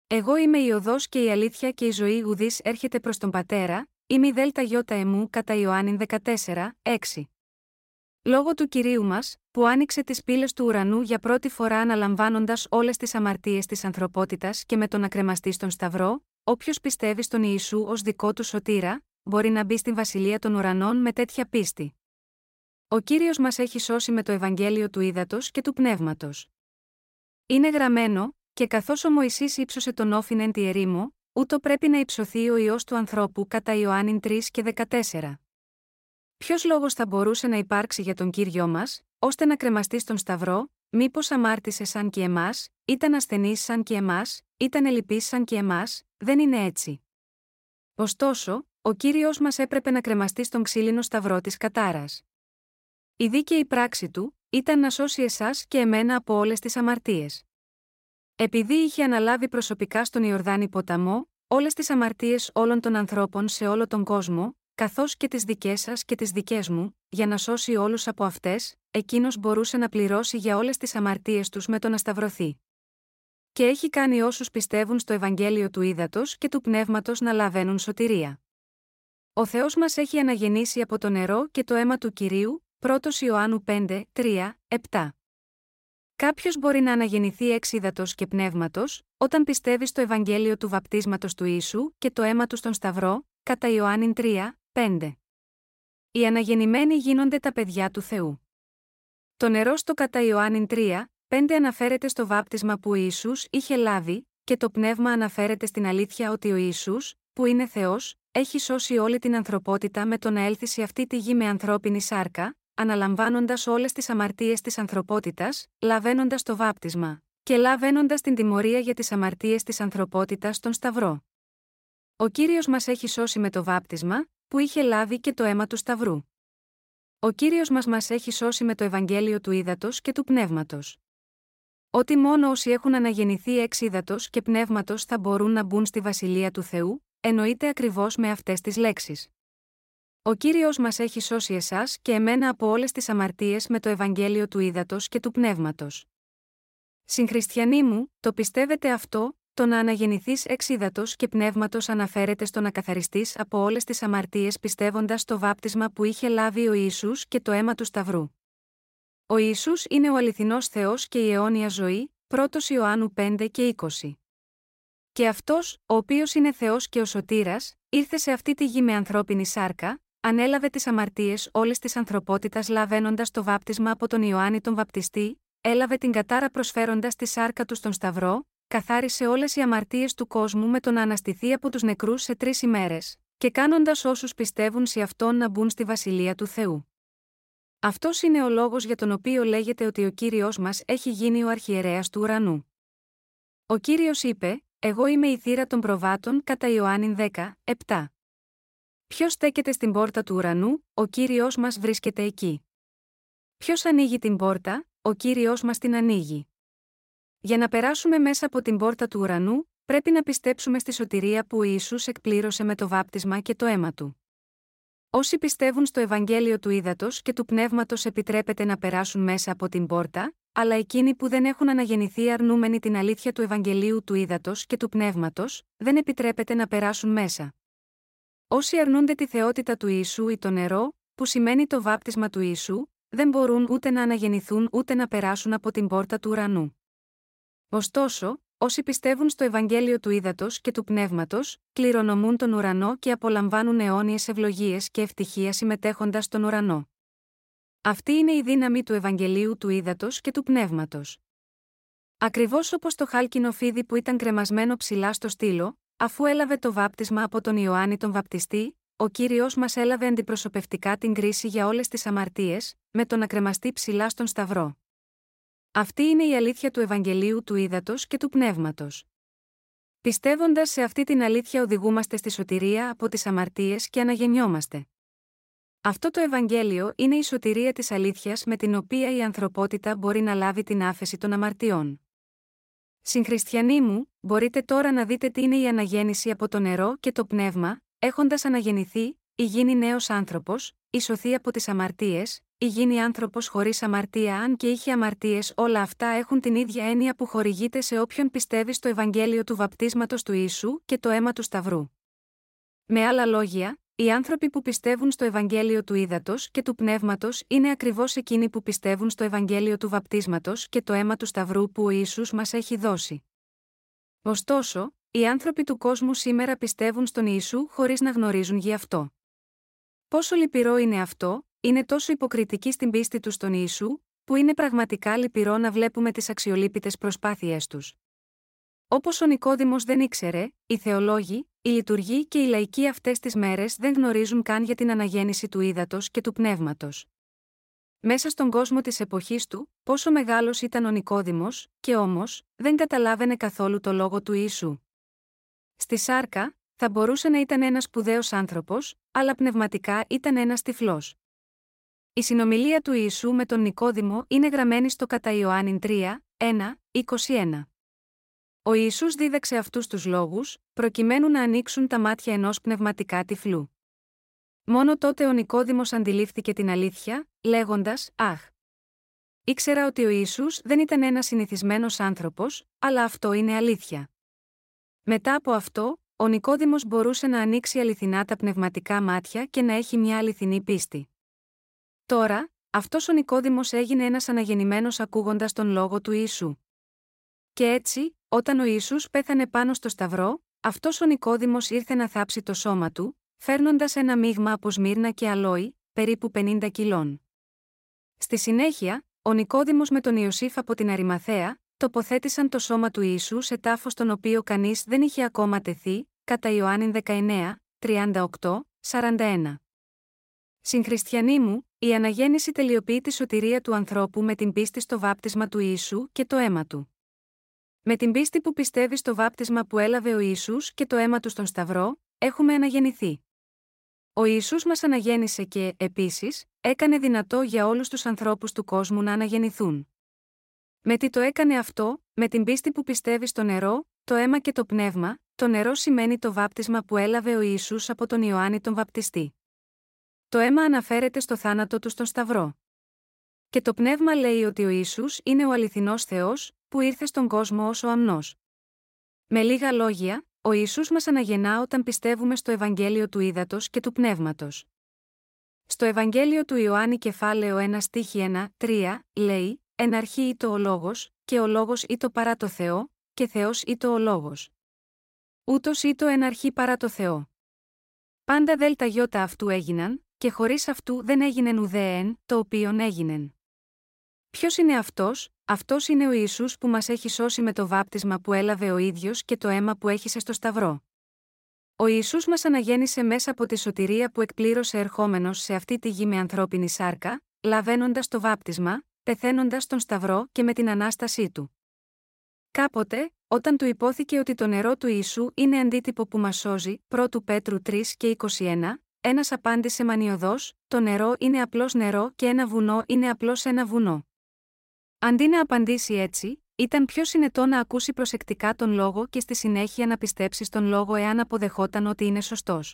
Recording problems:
none

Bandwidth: 16 kHz